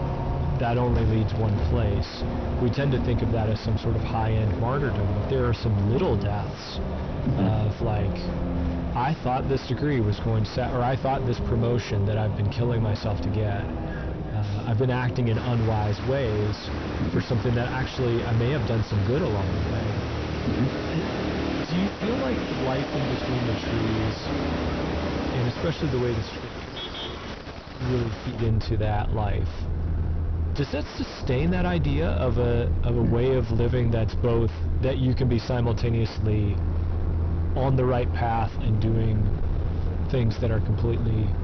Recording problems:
distortion; heavy; 4 dB below the speech
high frequencies cut off; noticeable; nothing above 6 kHz
traffic noise; loud; throughout; 3 dB below the speech

